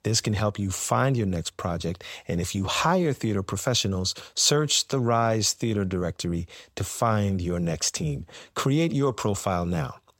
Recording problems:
none

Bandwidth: 16 kHz